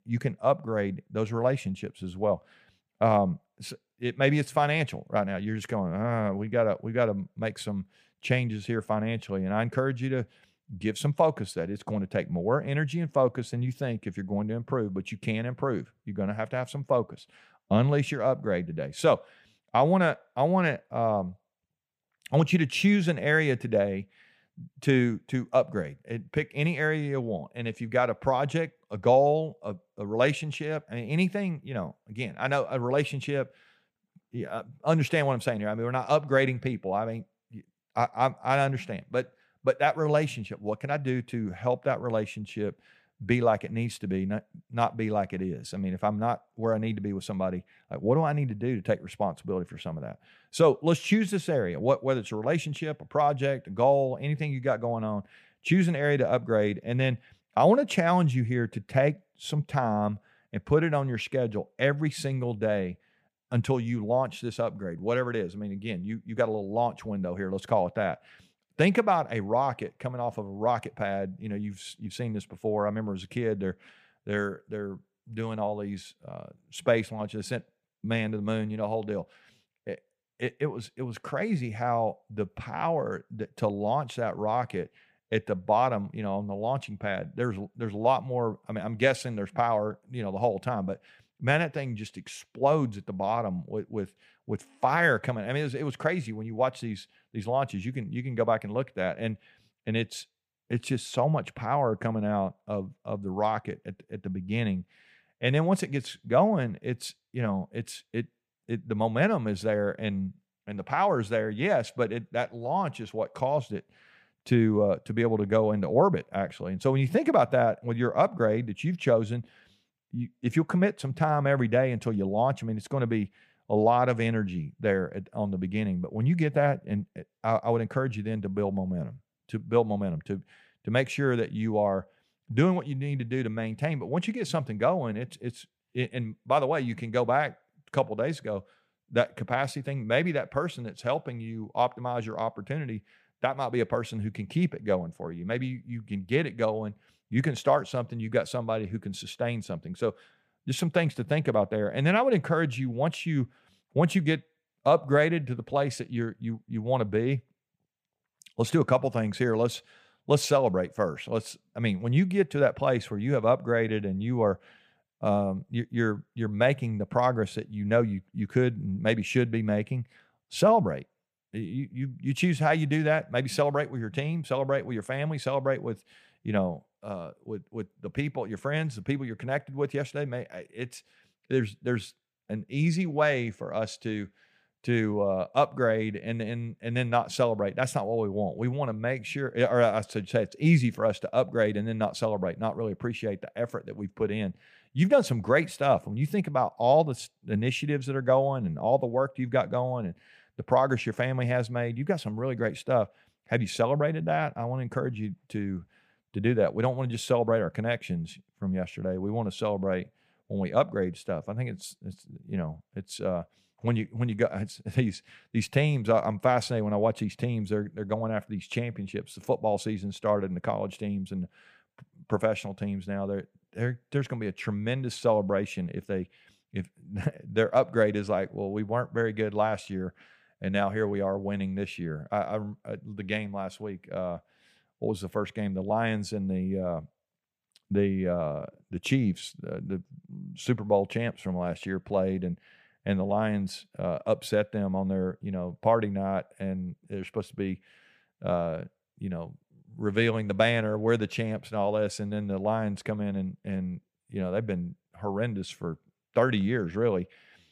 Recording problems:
none

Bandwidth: 15 kHz